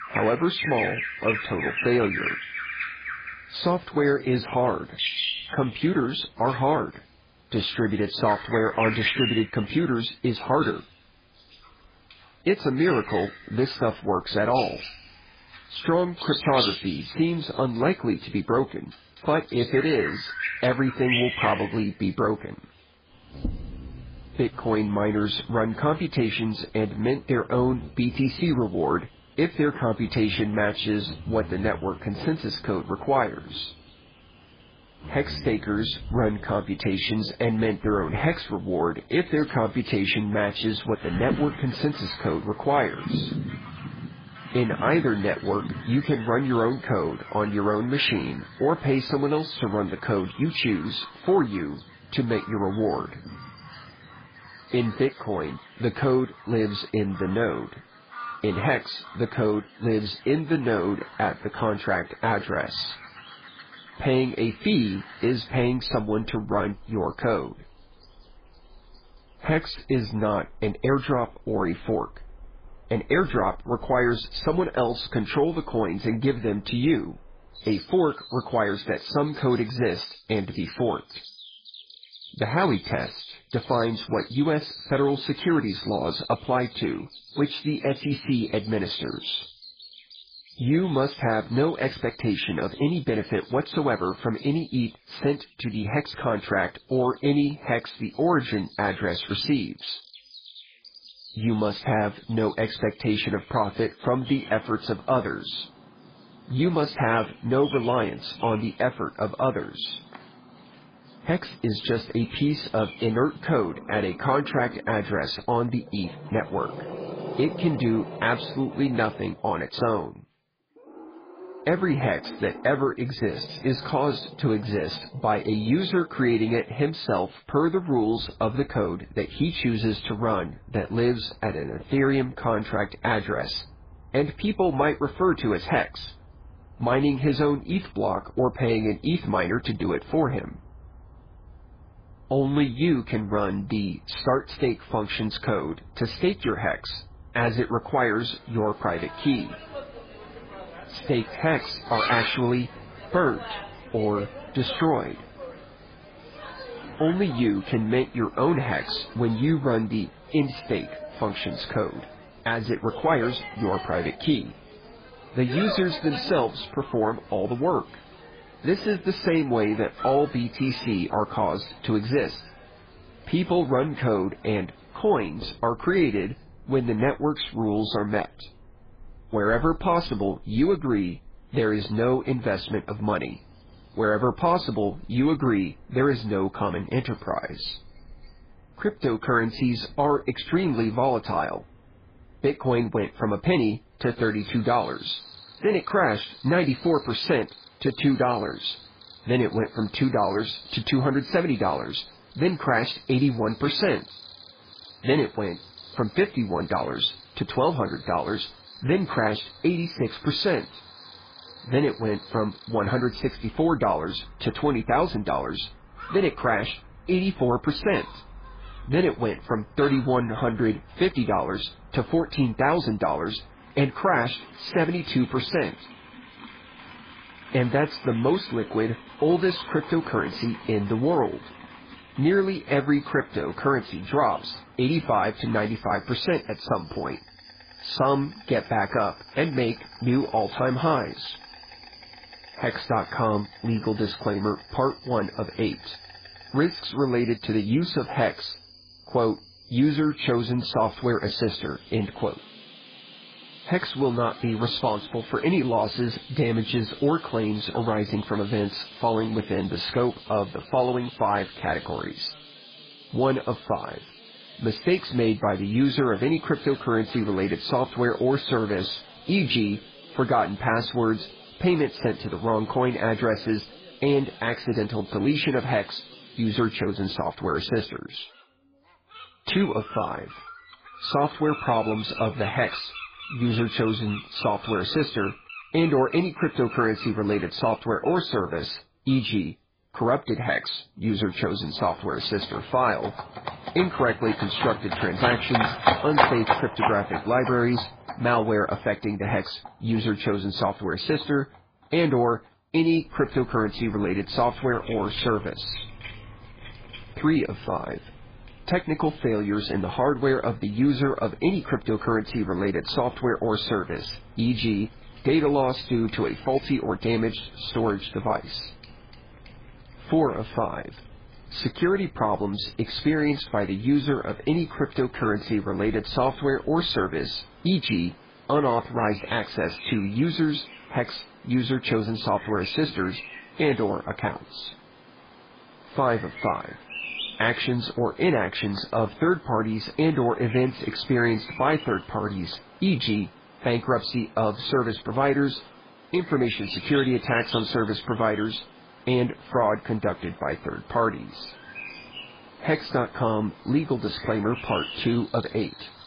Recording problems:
garbled, watery; badly
animal sounds; noticeable; throughout; 15 dB below the speech

